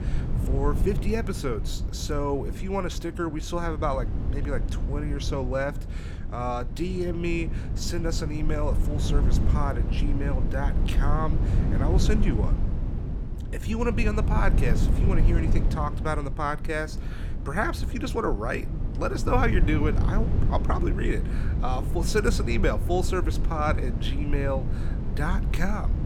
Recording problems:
low rumble; loud; throughout; 9 dB below the speech

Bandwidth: 18 kHz